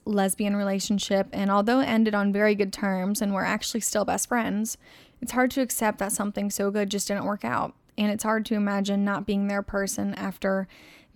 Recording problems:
none

